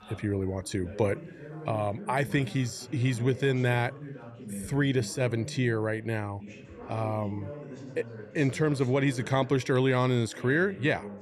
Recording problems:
background chatter; noticeable; throughout; 3 voices, 15 dB below the speech

